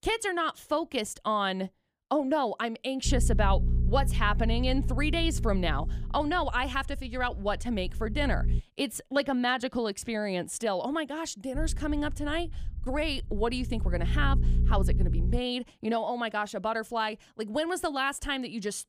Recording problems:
low rumble; noticeable; from 3 to 8.5 s and from 12 to 15 s; 15 dB below the speech

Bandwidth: 15 kHz